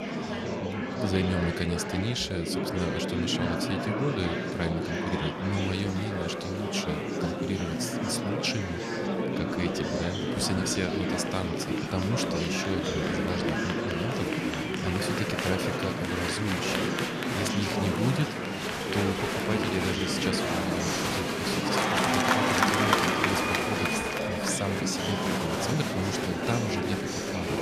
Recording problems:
murmuring crowd; very loud; throughout; 3 dB above the speech

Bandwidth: 14.5 kHz